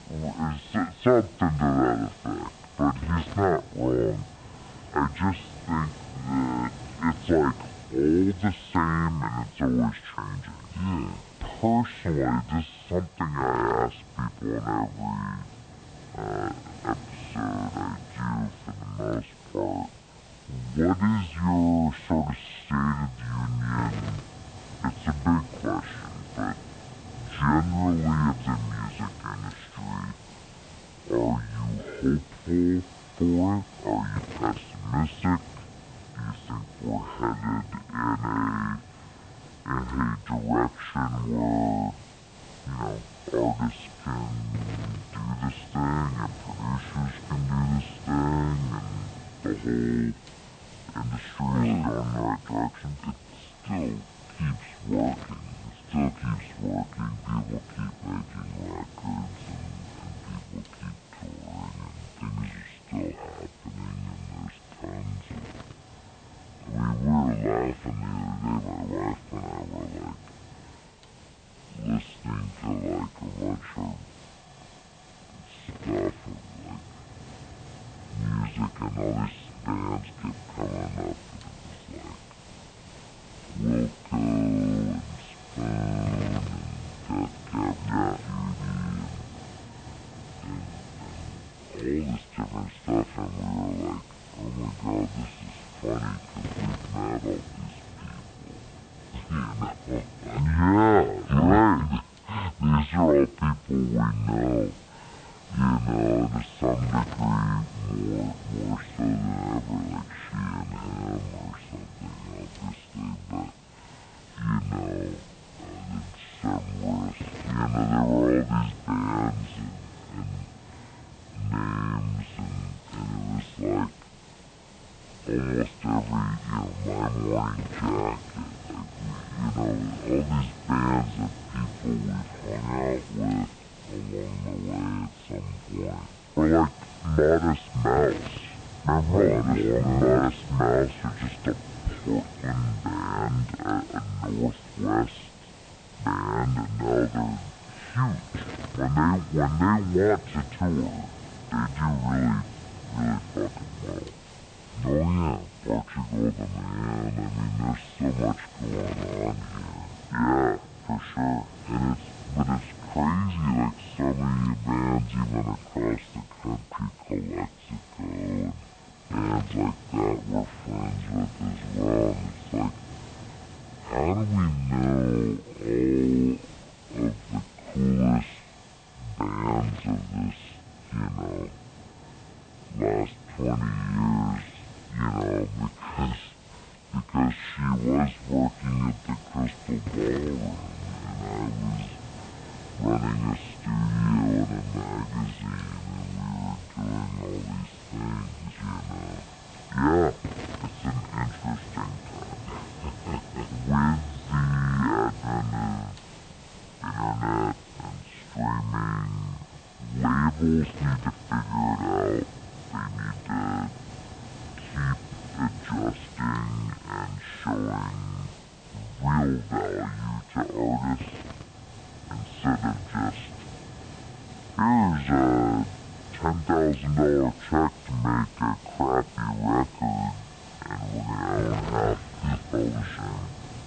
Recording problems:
high frequencies cut off; severe; nothing above 4 kHz
wrong speed and pitch; too slow and too low; 0.6 times normal speed
hiss; noticeable; throughout; 15 dB below the speech

